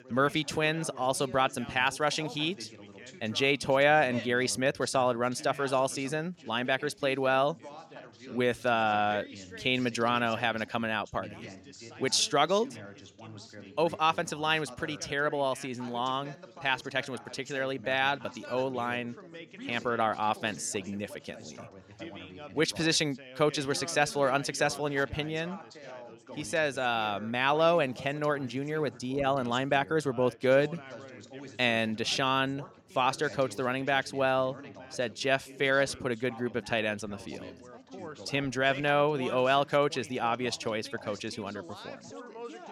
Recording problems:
background chatter; noticeable; throughout; 3 voices, 15 dB below the speech

